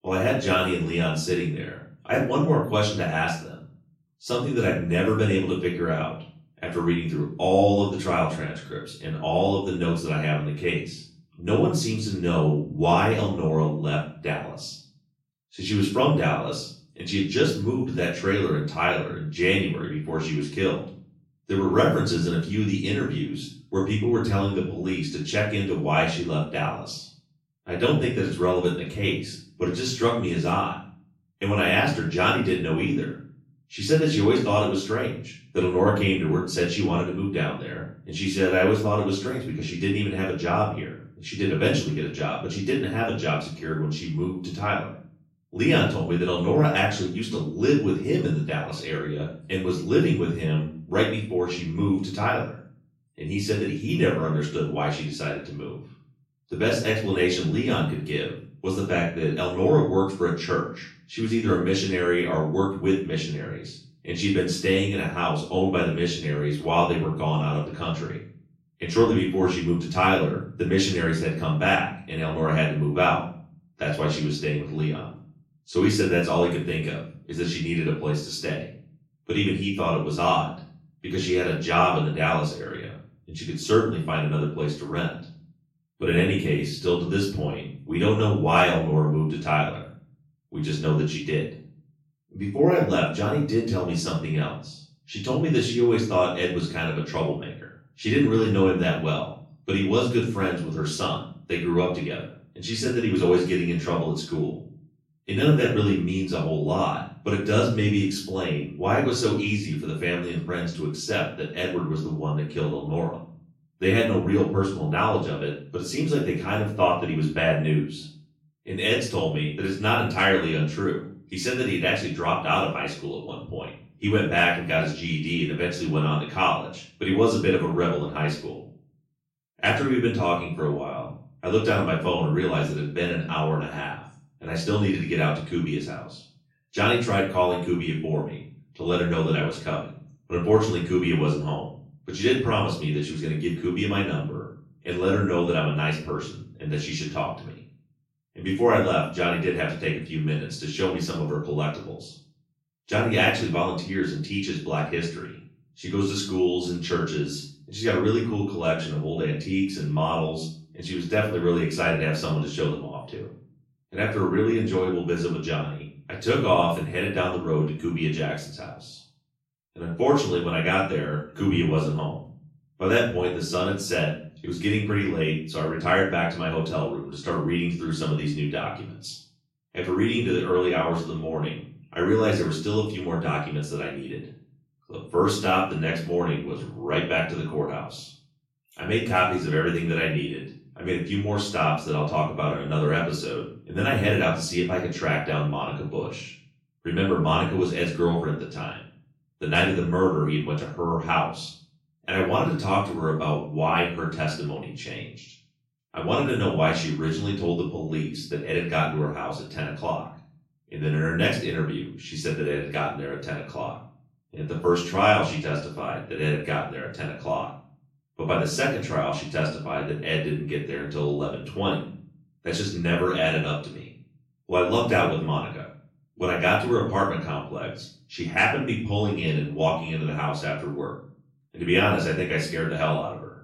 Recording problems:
off-mic speech; far
room echo; noticeable; dies away in 0.4 s

